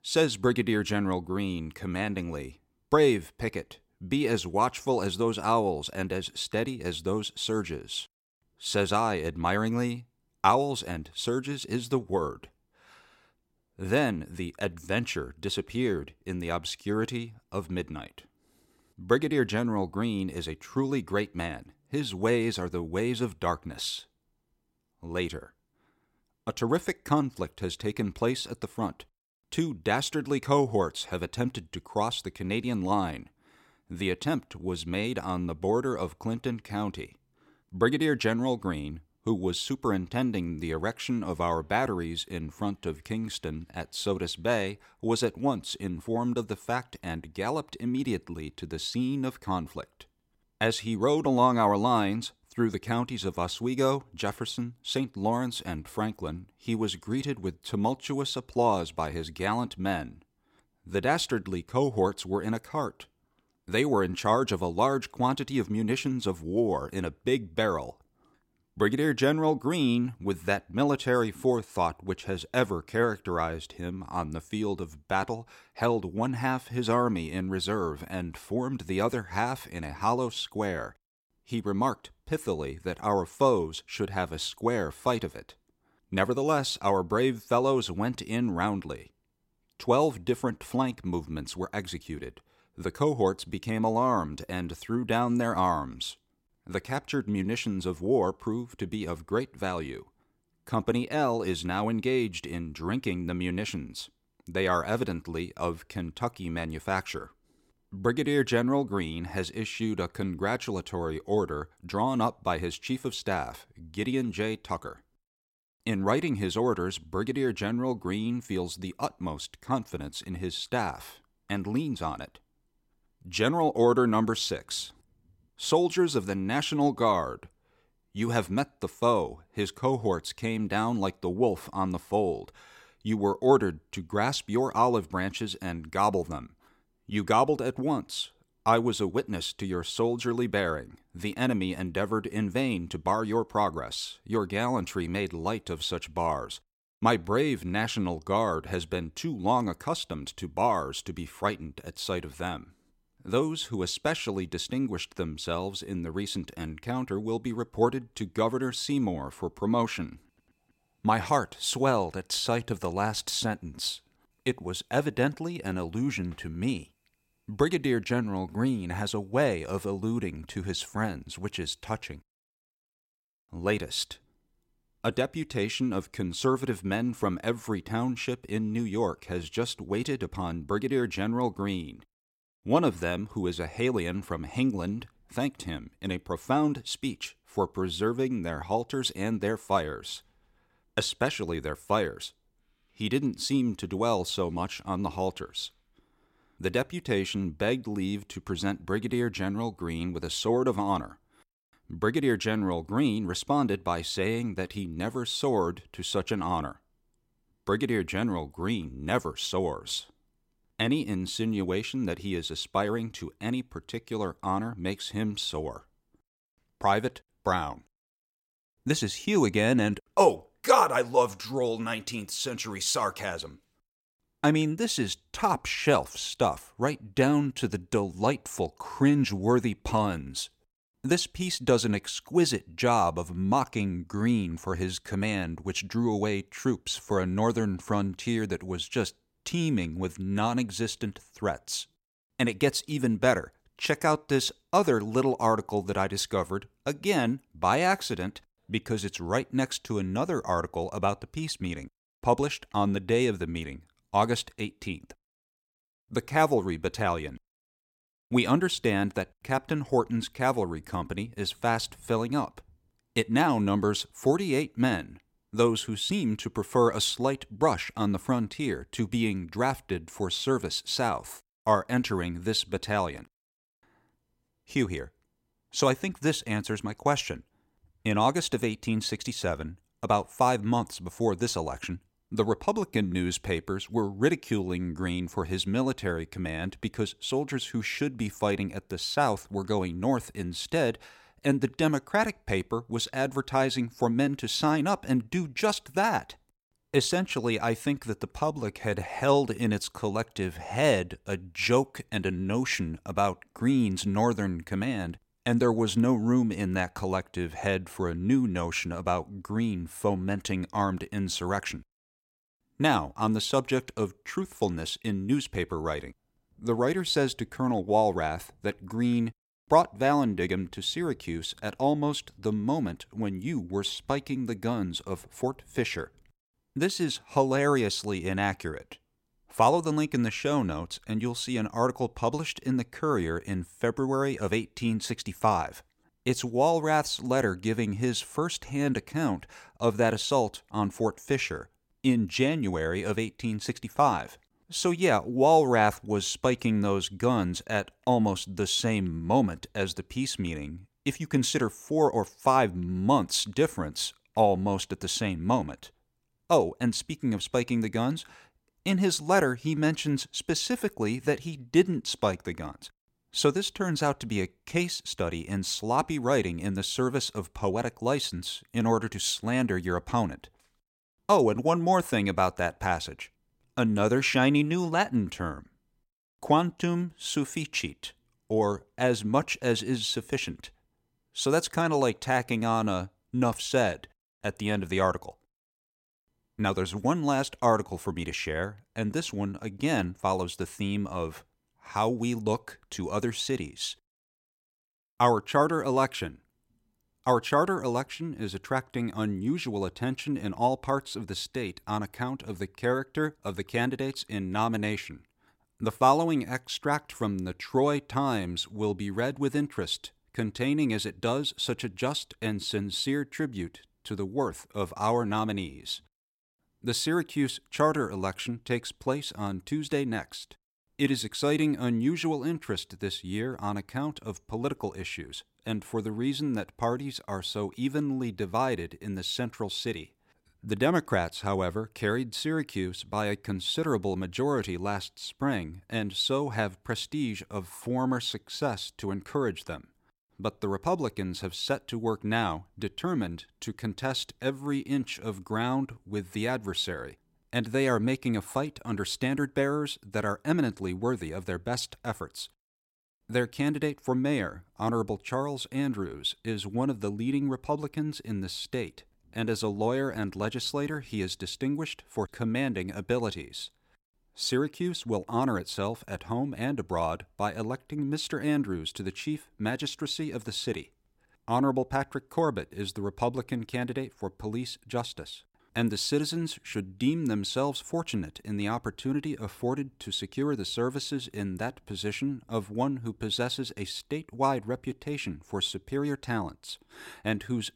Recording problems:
none

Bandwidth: 16.5 kHz